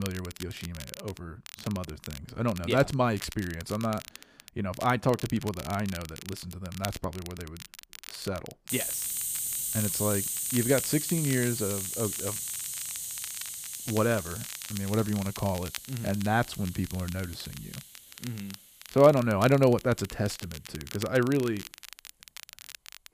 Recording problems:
hiss; loud; from 8.5 s on; 3 dB below the speech
crackle, like an old record; noticeable; 15 dB below the speech
abrupt cut into speech; at the start

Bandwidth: 15 kHz